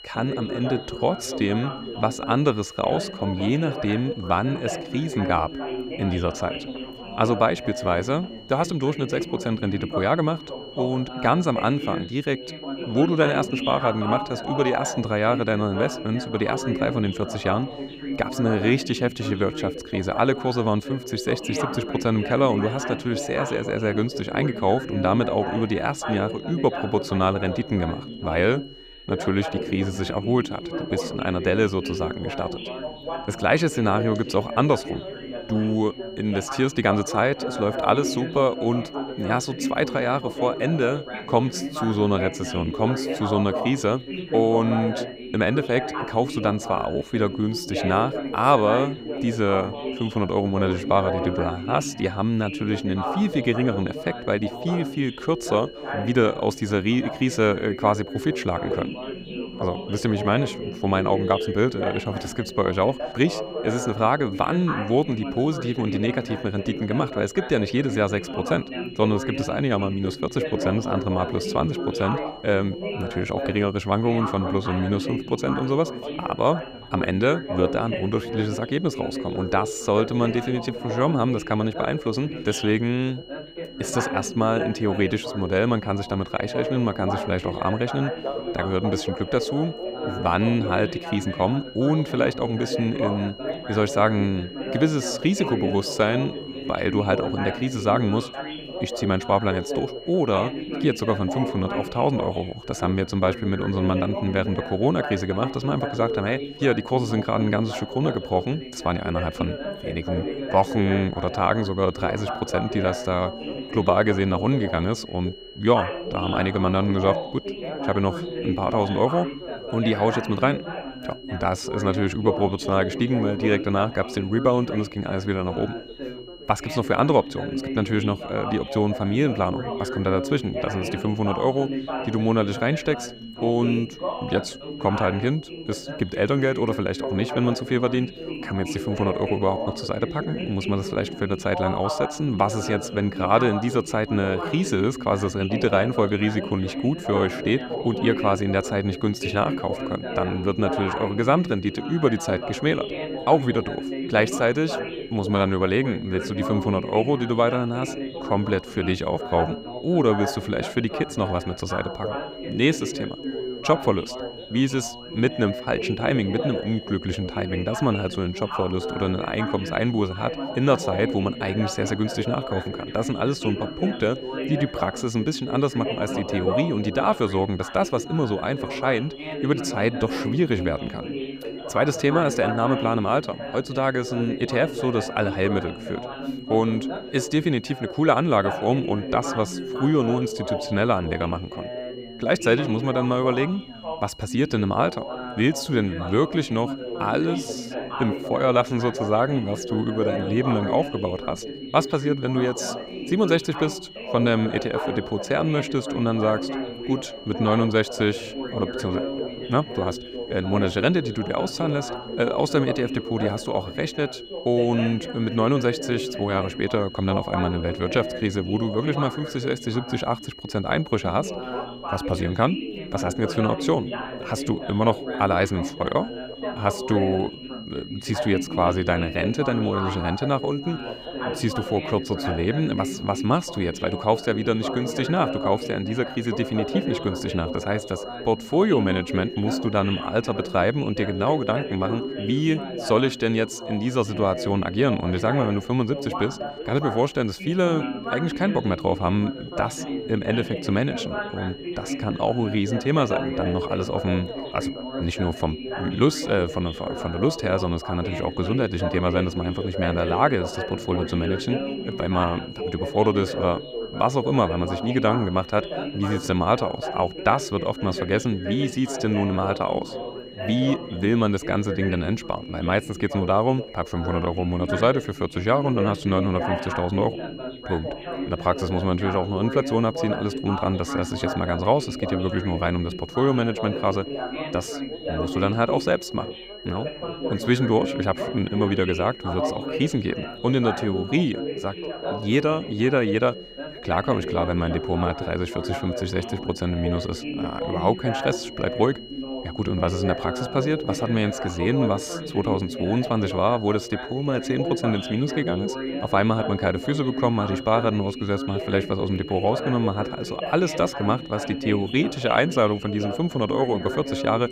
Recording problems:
background chatter; loud; throughout; 3 voices, 7 dB below the speech
high-pitched whine; noticeable; throughout; 3 kHz, 20 dB below the speech

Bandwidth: 15.5 kHz